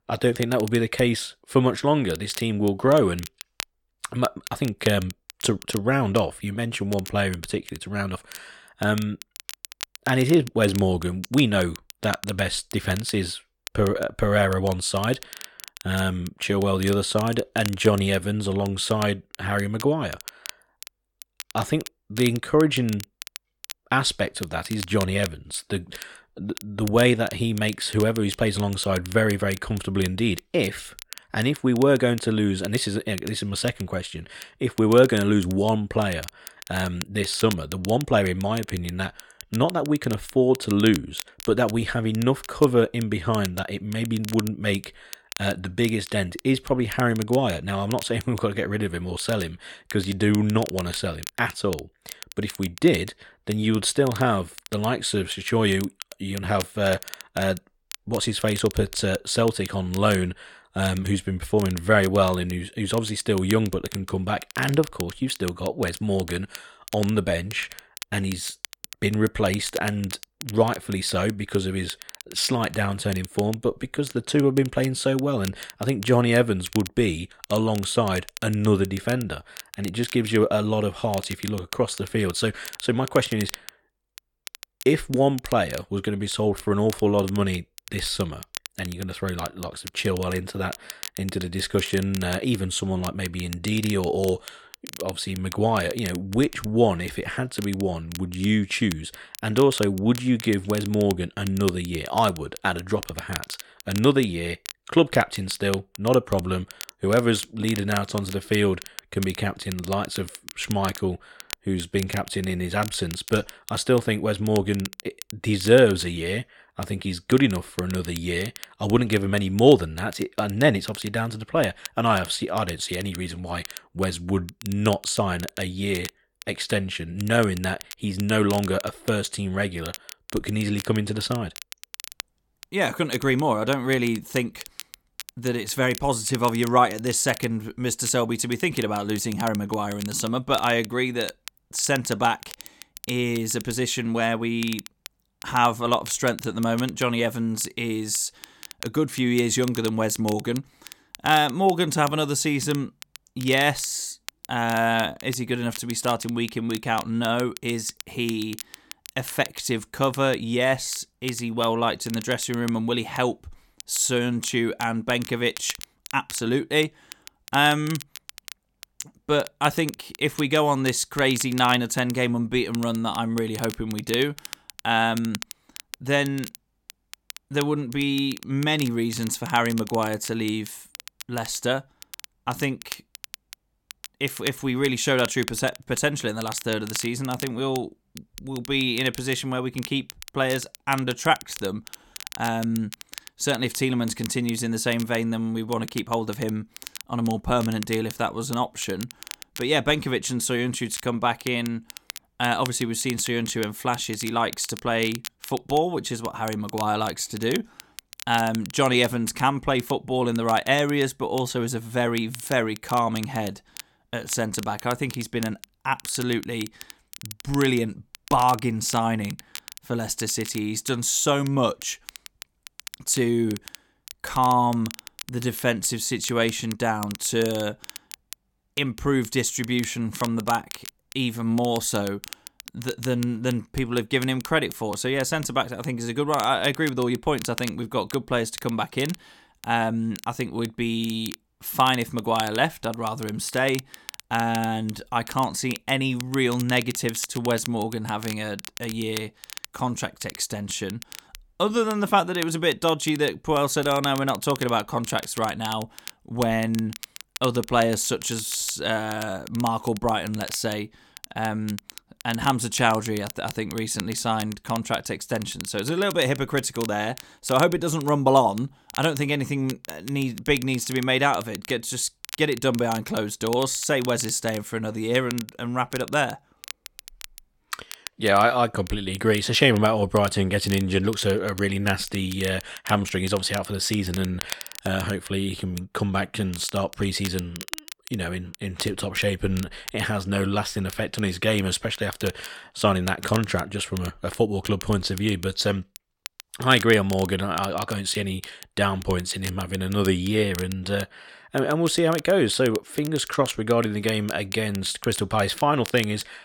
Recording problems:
crackle, like an old record; noticeable; 15 dB below the speech

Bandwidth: 17.5 kHz